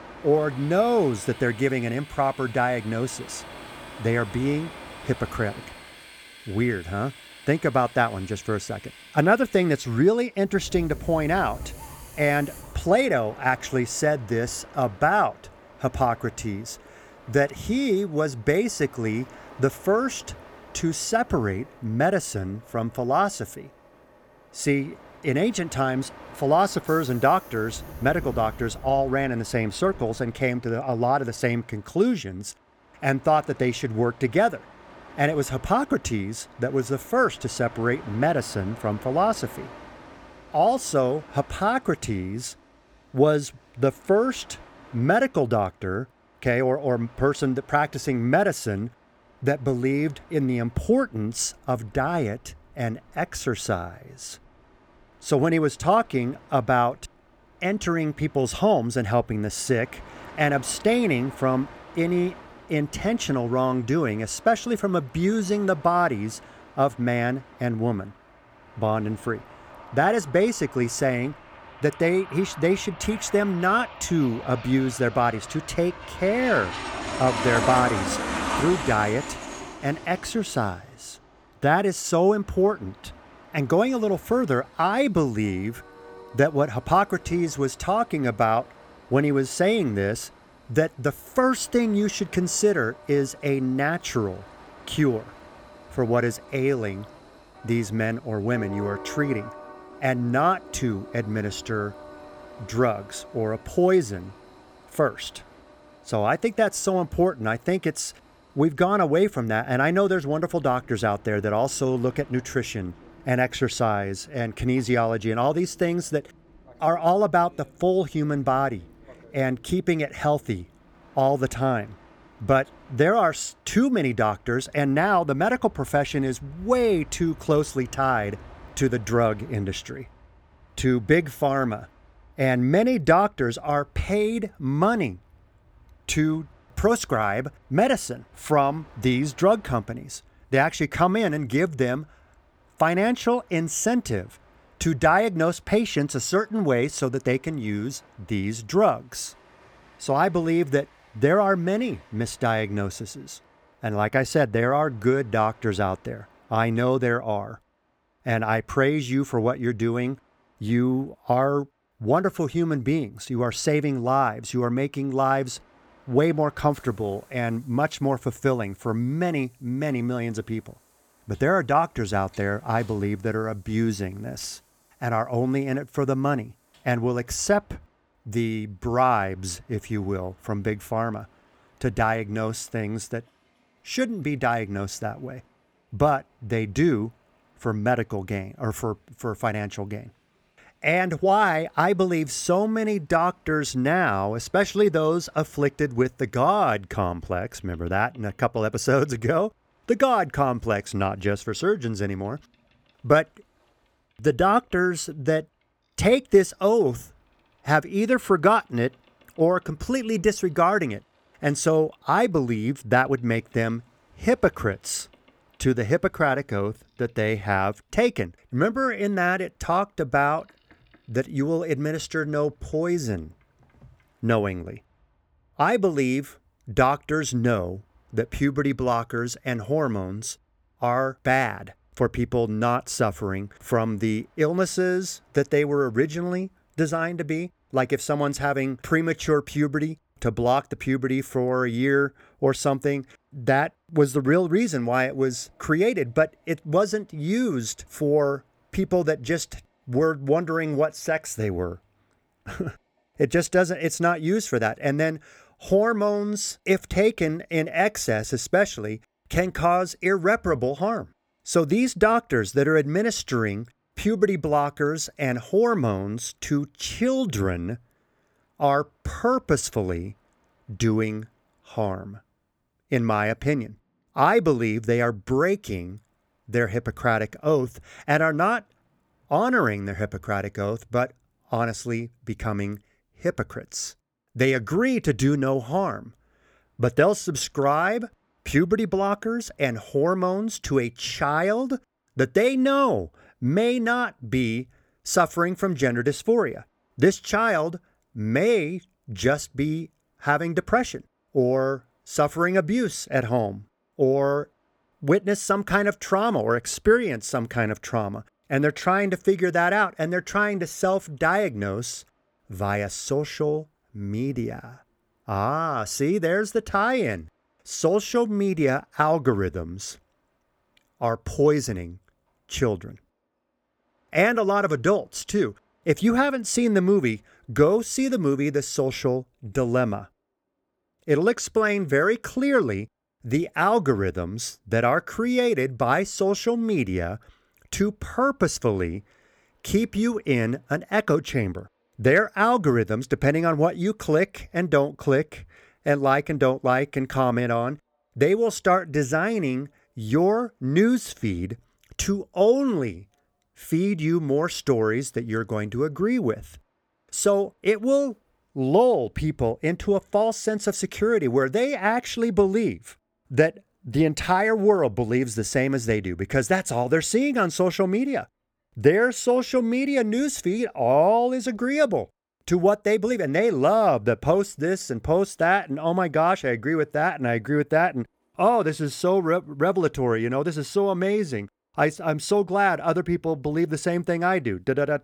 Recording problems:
train or aircraft noise; noticeable; throughout; 20 dB below the speech

